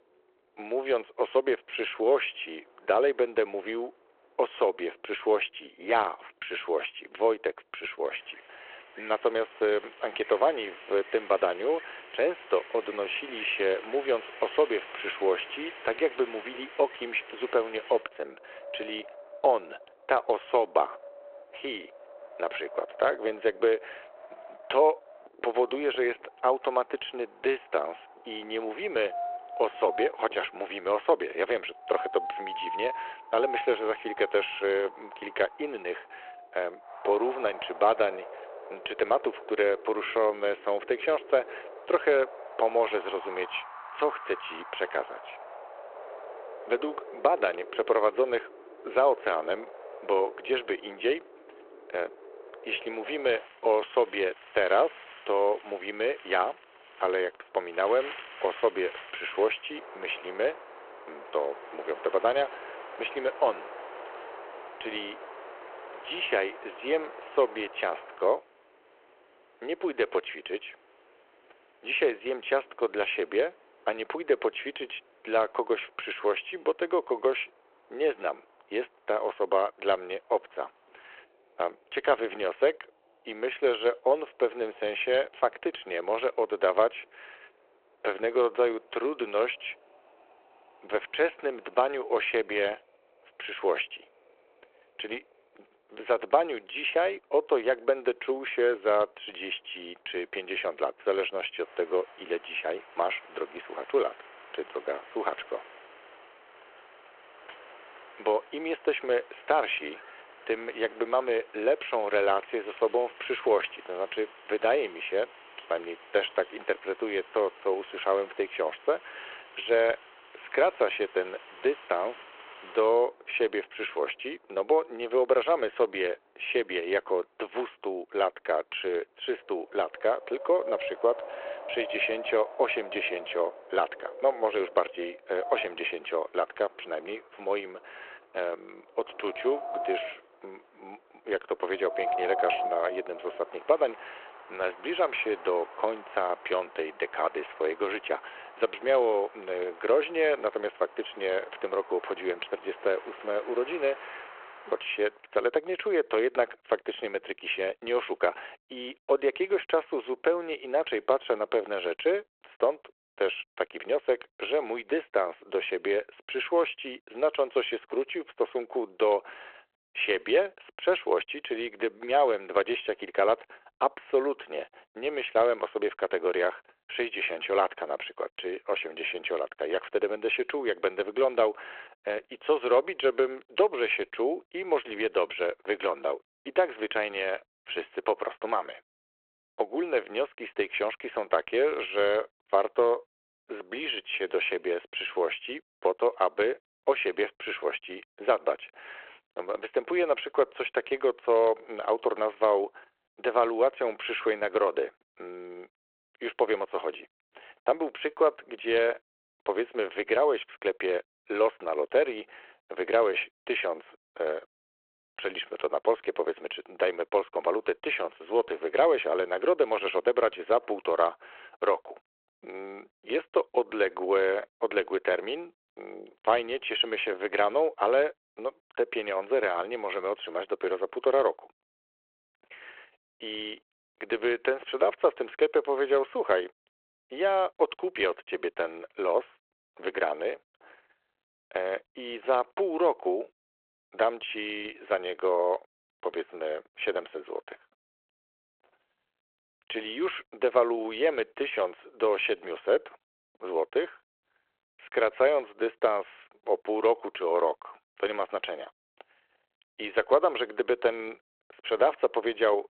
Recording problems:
phone-call audio
wind in the background; noticeable; until 2:35; 15 dB below the speech

